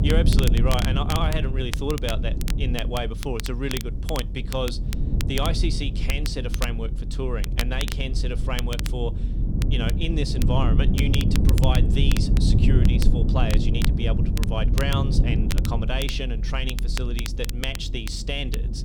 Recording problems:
low rumble; loud; throughout; 6 dB below the speech
crackle, like an old record; loud; 7 dB below the speech

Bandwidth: 19 kHz